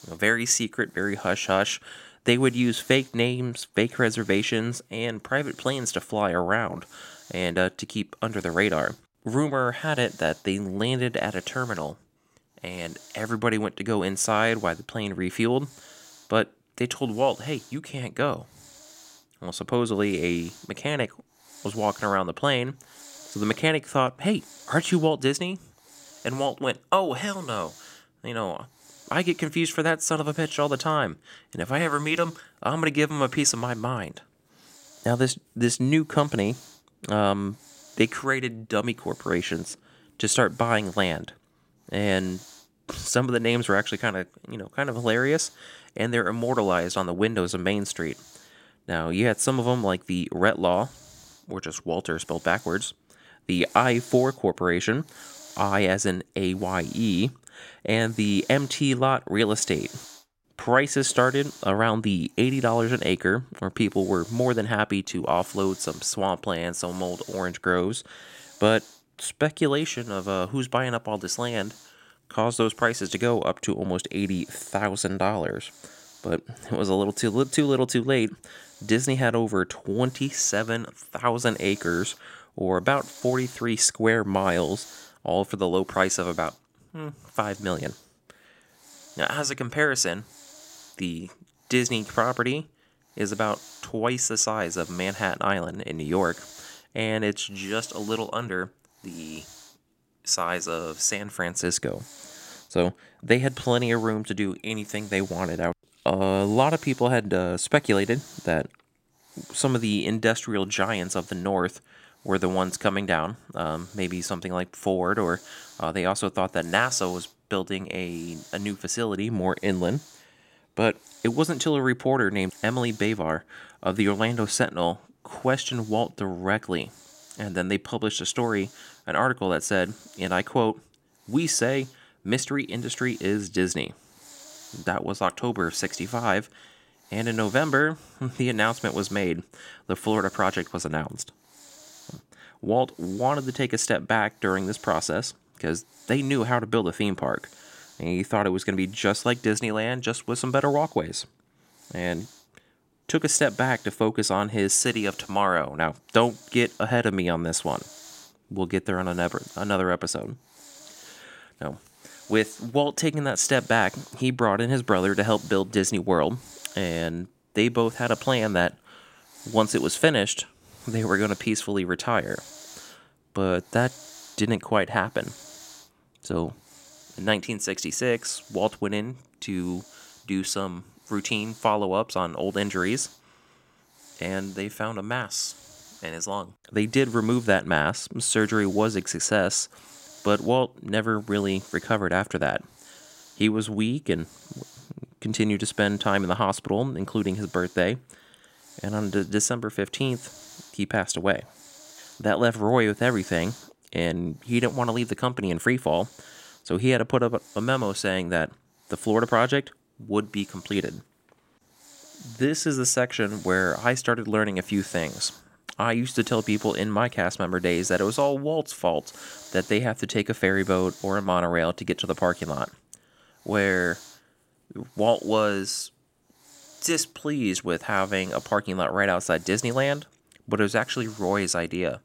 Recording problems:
hiss; faint; throughout; 20 dB below the speech

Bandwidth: 16 kHz